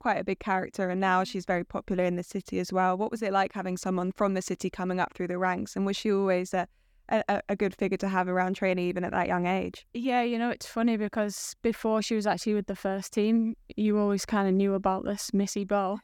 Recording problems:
none

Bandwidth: 18.5 kHz